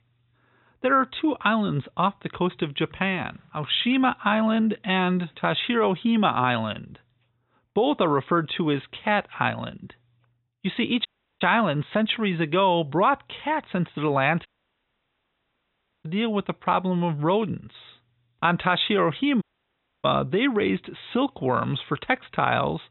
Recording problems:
high frequencies cut off; severe; nothing above 4 kHz
audio cutting out; at 11 s, at 14 s for 1.5 s and at 19 s for 0.5 s

